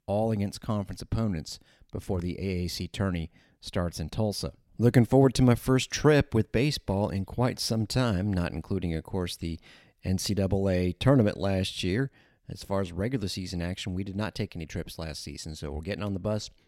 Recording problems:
none

